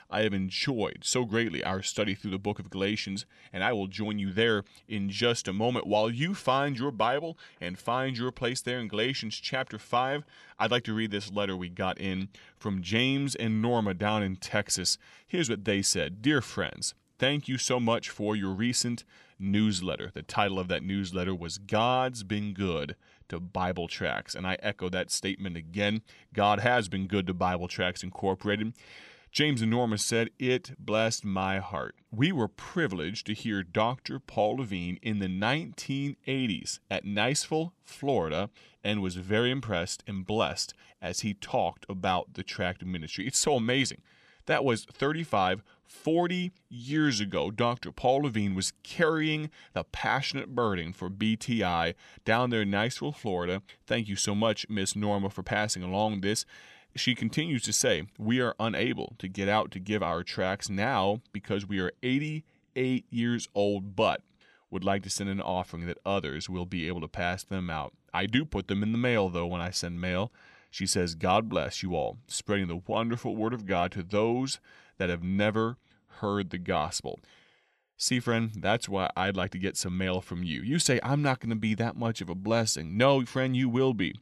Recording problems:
none

